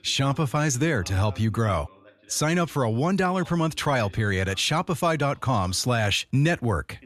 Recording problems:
voice in the background; faint; throughout; 25 dB below the speech

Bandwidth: 13.5 kHz